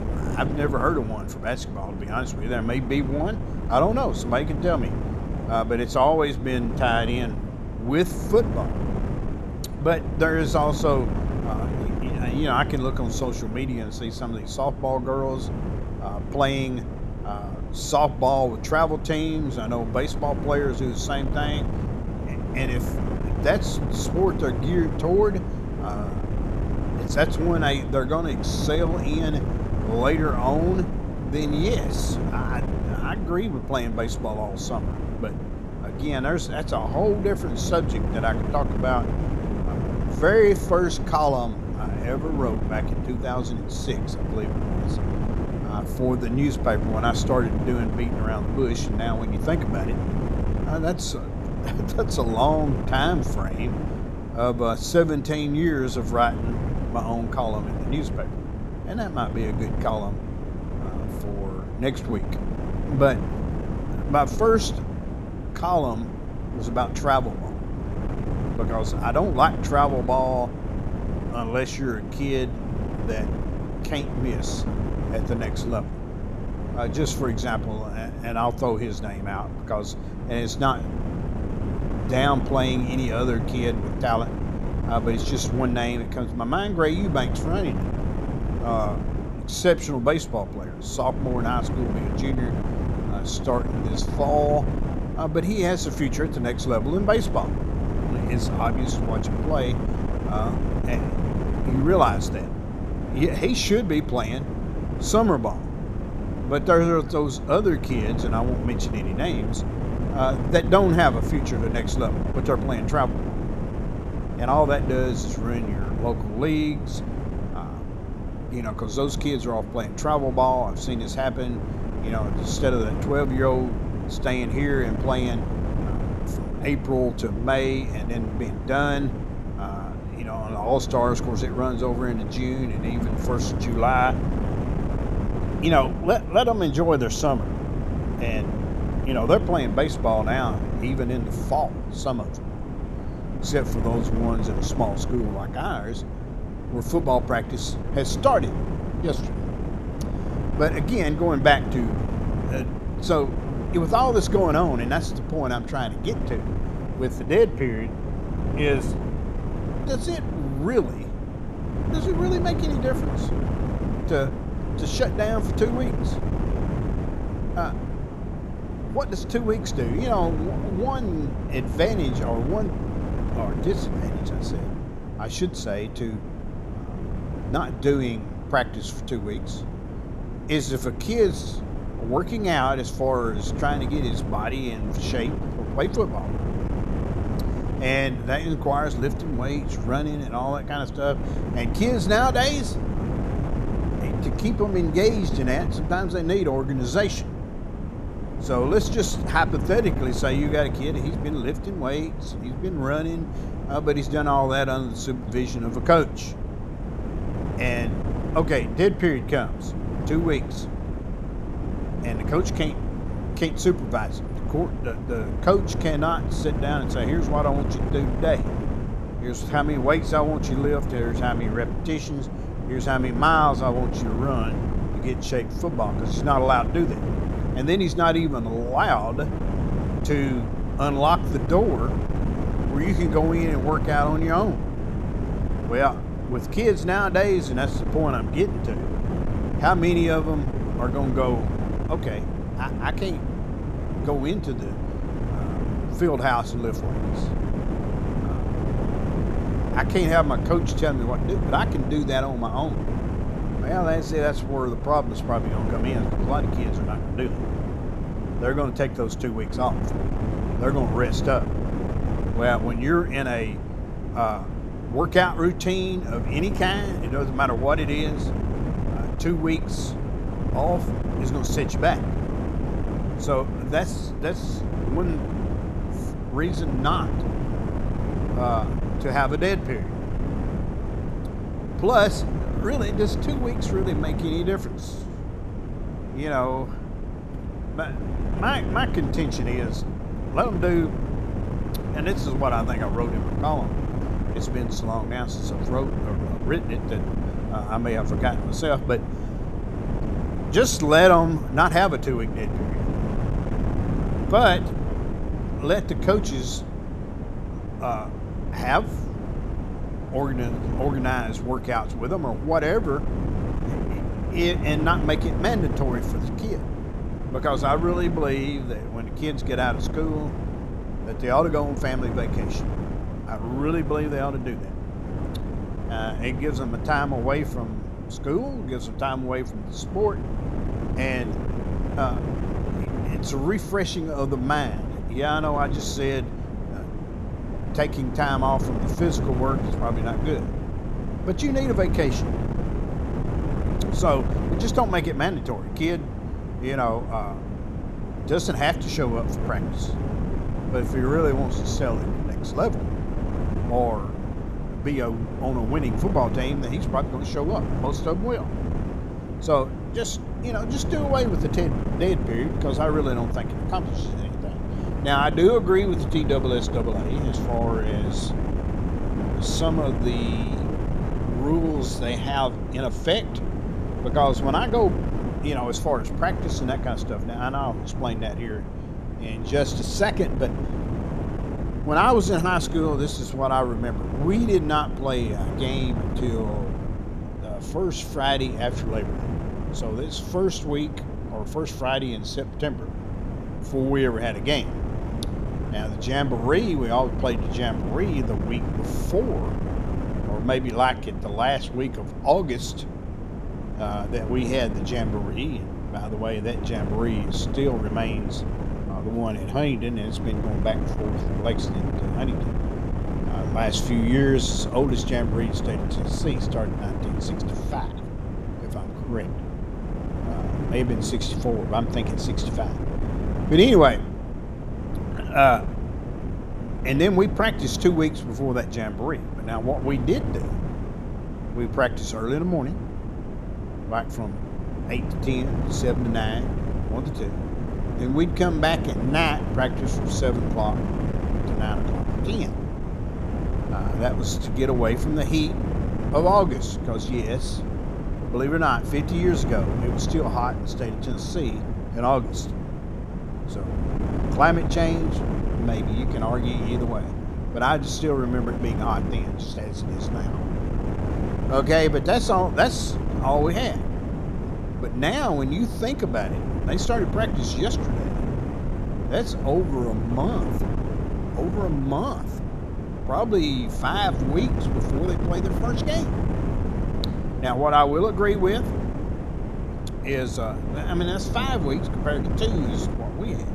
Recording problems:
wind noise on the microphone; heavy; 10 dB below the speech

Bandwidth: 13.5 kHz